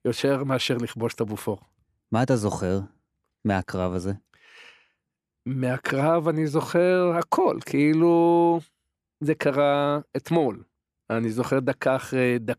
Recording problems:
none

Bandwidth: 14 kHz